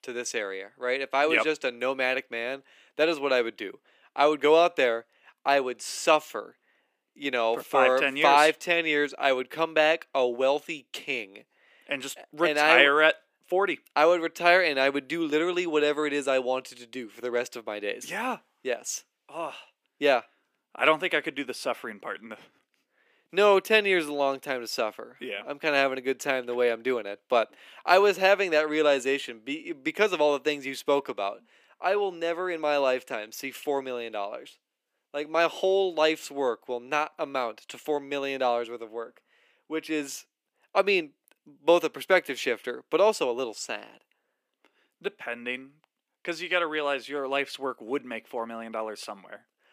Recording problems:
thin; somewhat; fading below 300 Hz

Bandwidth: 15 kHz